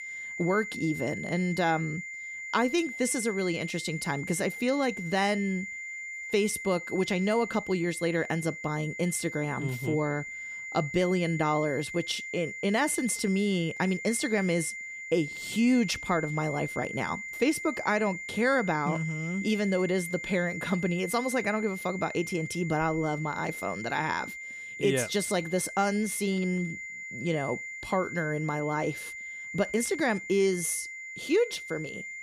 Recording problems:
high-pitched whine; loud; throughout; 2 kHz, 8 dB below the speech

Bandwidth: 15 kHz